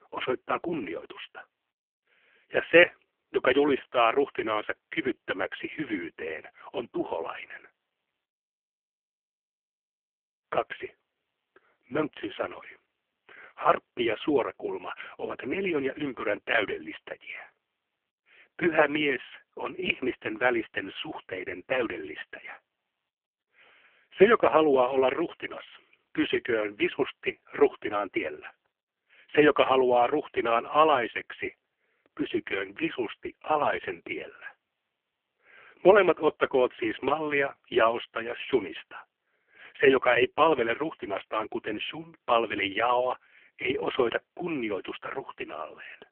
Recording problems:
phone-call audio; poor line; nothing above 3 kHz

